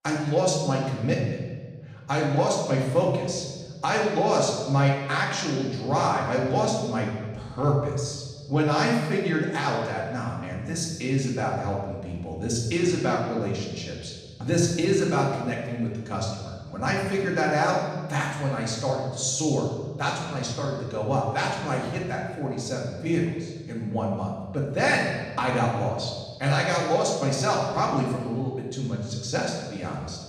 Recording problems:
off-mic speech; far
room echo; noticeable; dies away in 1.3 s

